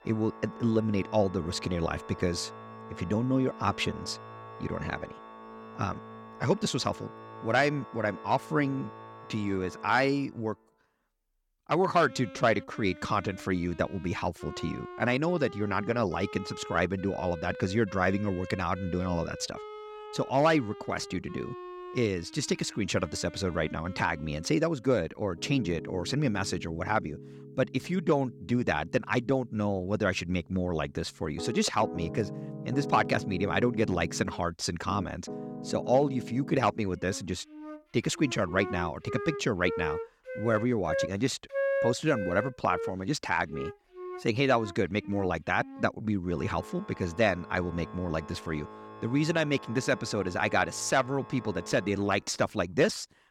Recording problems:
background music; noticeable; throughout; 10 dB below the speech

